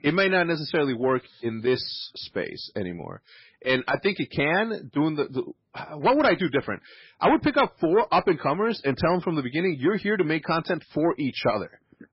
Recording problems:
garbled, watery; badly; nothing above 5.5 kHz
distortion; slight; 10 dB below the speech

